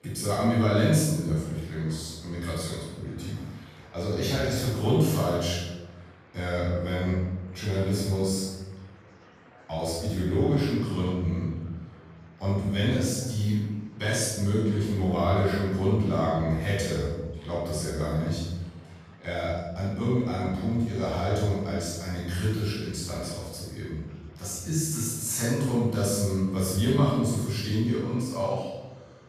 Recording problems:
room echo; strong; dies away in 0.9 s
off-mic speech; far
murmuring crowd; faint; throughout; 25 dB below the speech

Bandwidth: 14.5 kHz